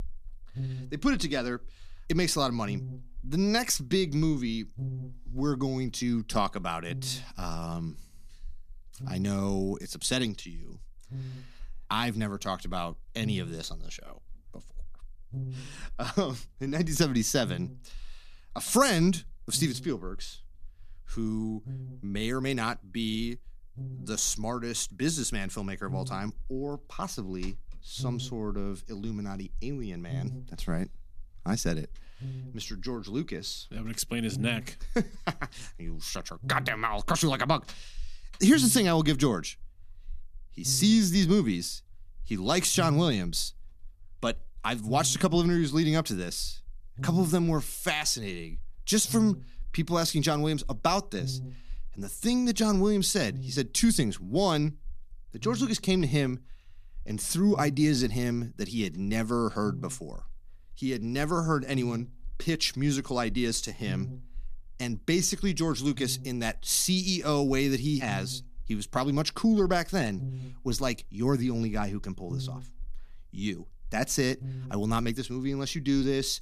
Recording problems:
electrical hum; faint; throughout; 60 Hz, 20 dB below the speech

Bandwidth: 14.5 kHz